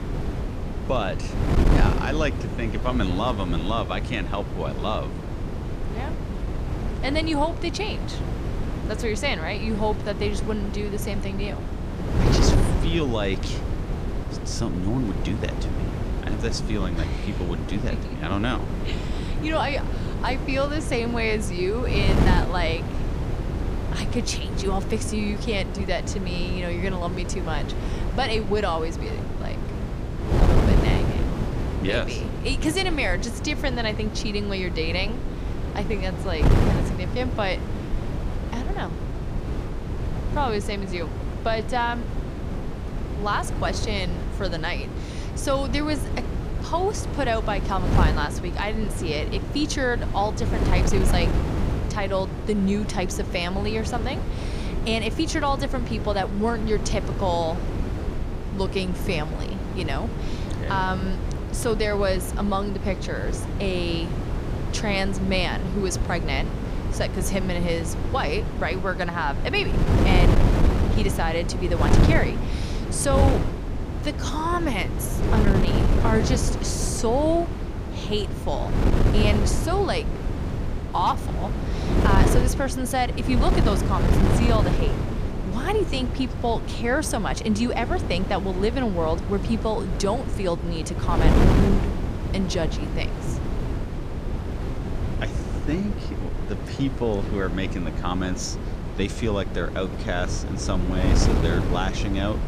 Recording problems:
wind noise on the microphone; heavy; 6 dB below the speech

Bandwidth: 15 kHz